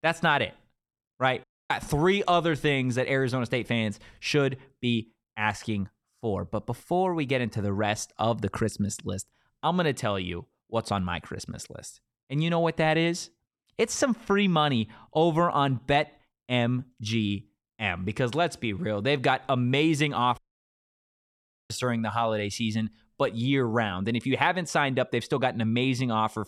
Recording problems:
audio cutting out; at 1.5 s and at 20 s for 1.5 s

